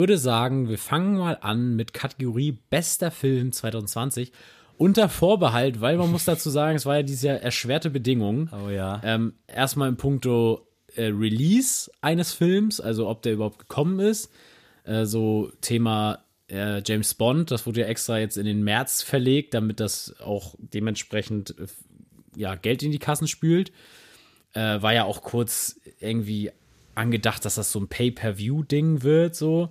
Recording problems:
abrupt cut into speech; at the start

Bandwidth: 14.5 kHz